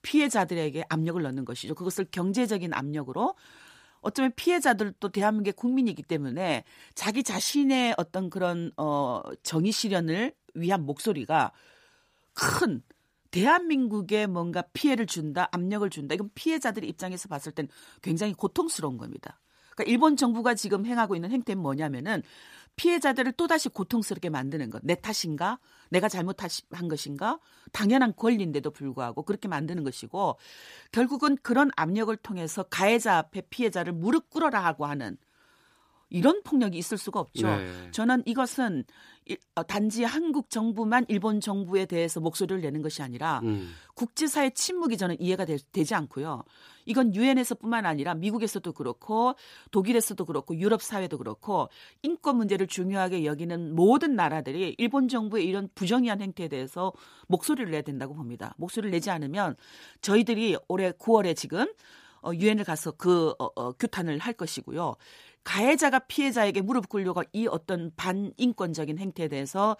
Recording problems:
none

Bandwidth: 15 kHz